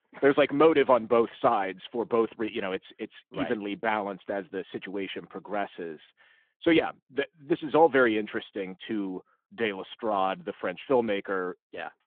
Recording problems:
phone-call audio

